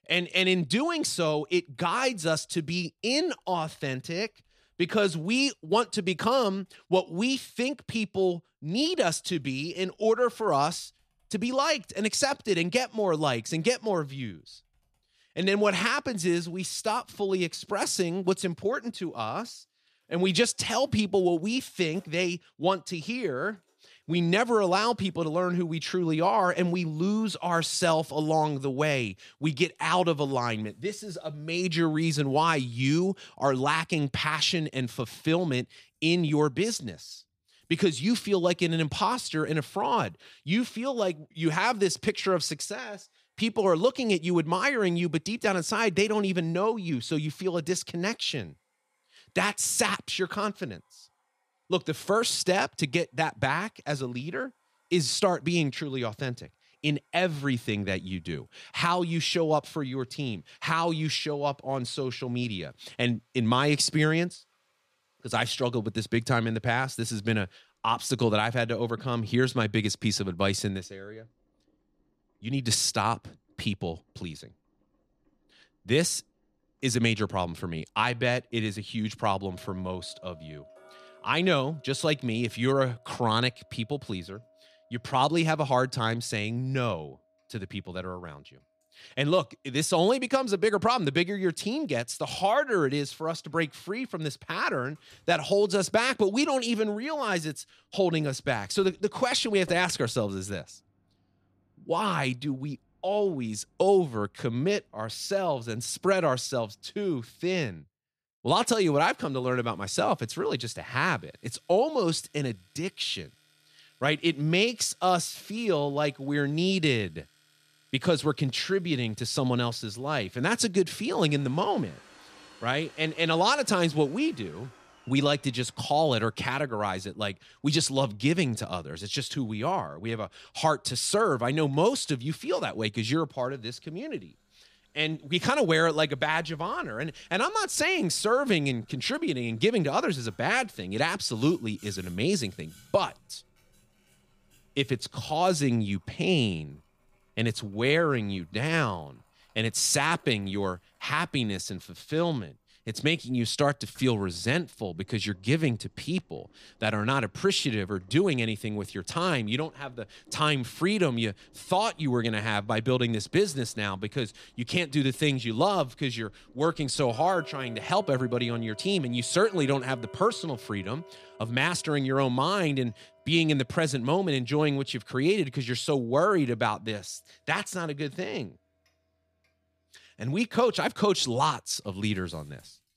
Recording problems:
household noises; faint; throughout; 30 dB below the speech

